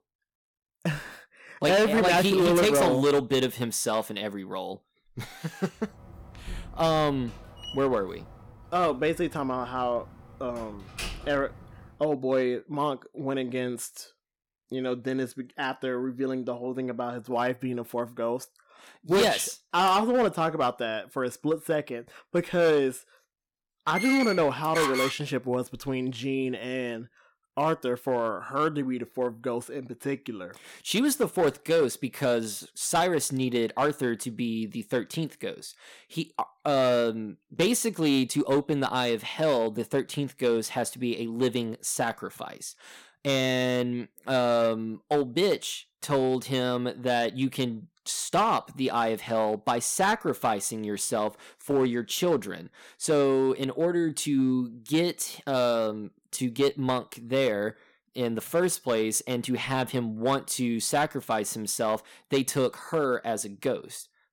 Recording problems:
distortion; slight; 4% of the sound clipped
door banging; noticeable; from 6 to 12 s; peak 8 dB below the speech
door banging; loud; from 24 to 25 s; peak level with the speech

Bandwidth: 17 kHz